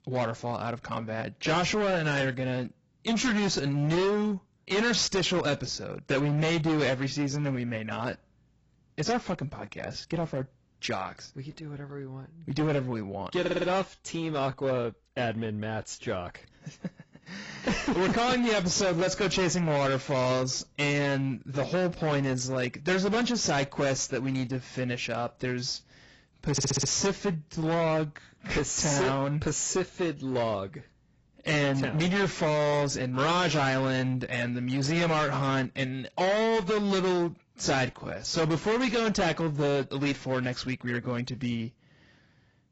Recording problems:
distortion; heavy; 16% of the sound clipped
garbled, watery; badly; nothing above 7.5 kHz
audio stuttering; at 13 s and at 27 s

